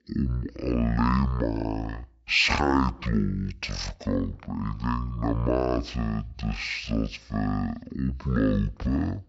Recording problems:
wrong speed and pitch; too slow and too low; 0.5 times normal speed

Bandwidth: 7.5 kHz